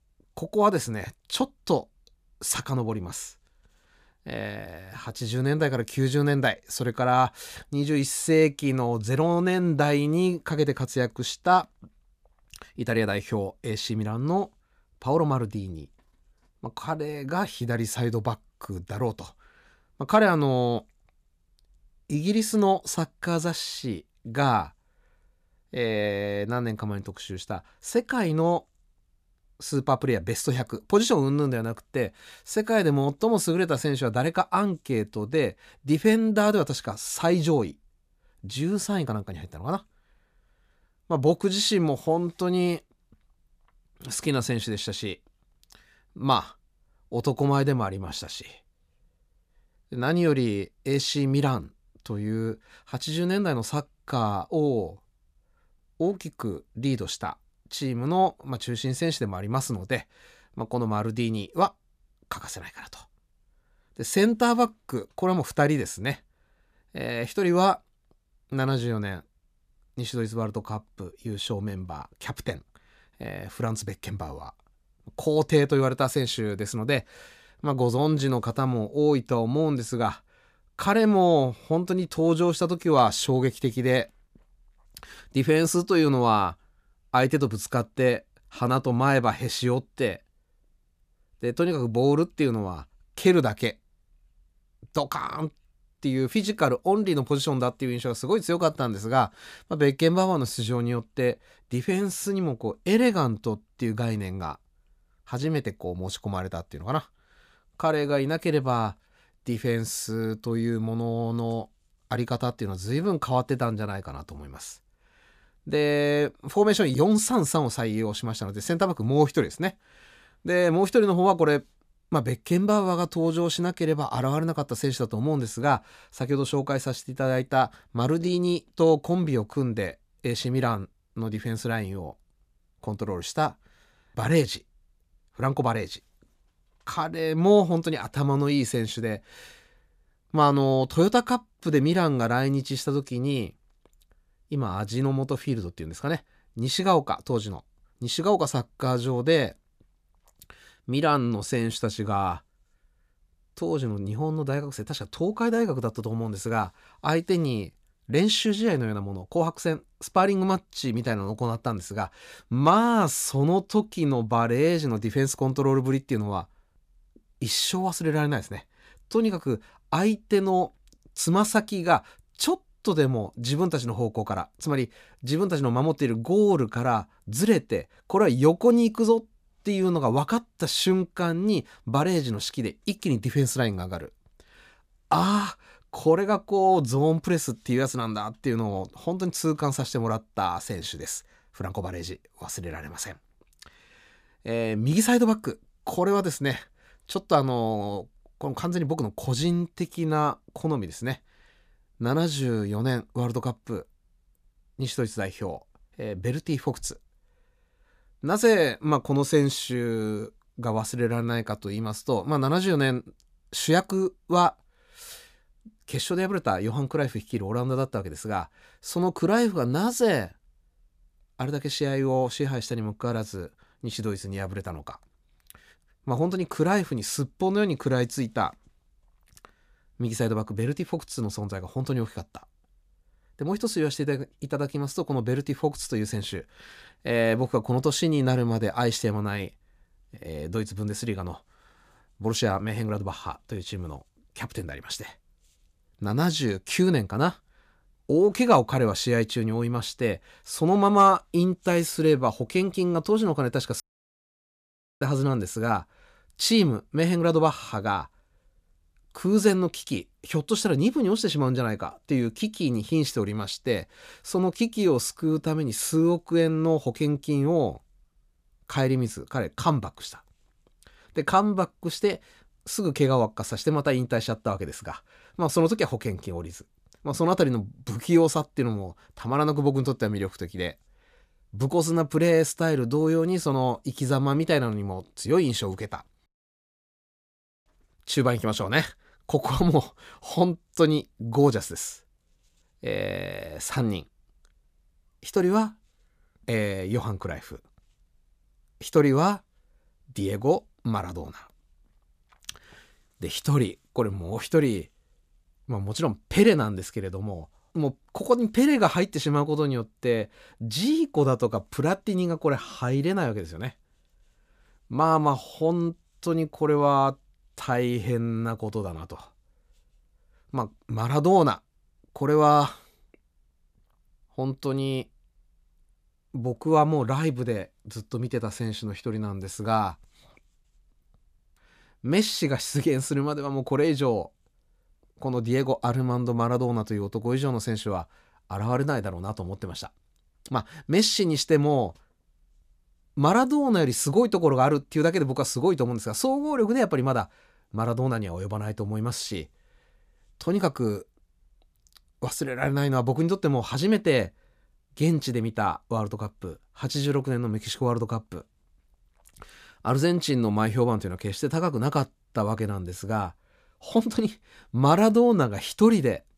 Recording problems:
audio cutting out; at 4:14 for 1 s and at 4:46 for 1.5 s

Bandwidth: 14.5 kHz